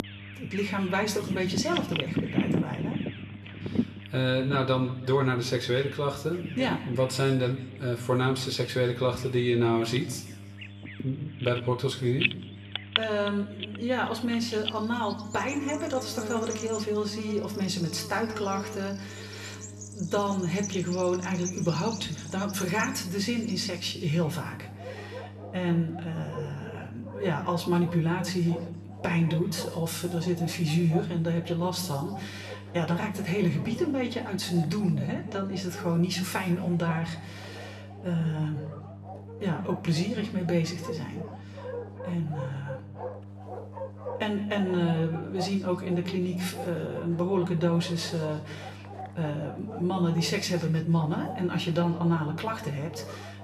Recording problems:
room echo; slight; dies away in 0.8 s
off-mic speech; somewhat distant
animal sounds; noticeable; throughout; 10 dB below the speech
electrical hum; faint; throughout; 50 Hz, 25 dB below the speech

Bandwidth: 13.5 kHz